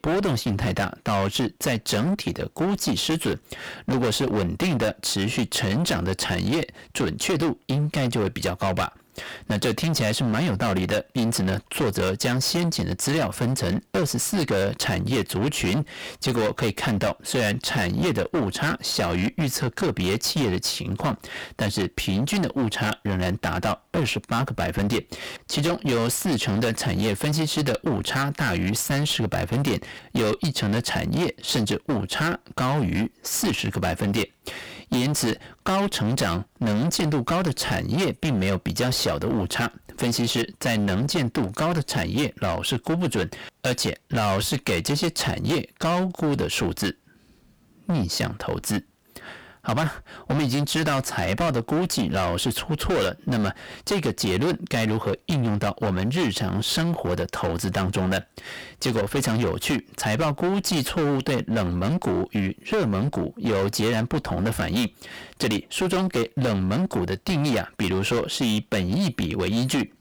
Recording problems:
distortion; heavy; 23% of the sound clipped

